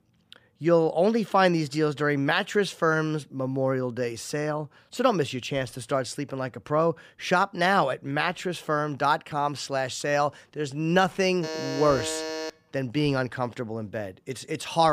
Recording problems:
alarm; noticeable; from 11 to 13 s; peak 6 dB below the speech
abrupt cut into speech; at the end

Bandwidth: 15 kHz